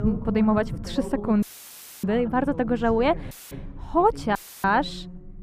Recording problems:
muffled; slightly; fading above 2.5 kHz
voice in the background; noticeable; throughout; 15 dB below the speech
low rumble; faint; throughout; 25 dB below the speech
audio cutting out; filled with static; at 1.5 s for 0.5 s, at 3.5 s and at 4.5 s

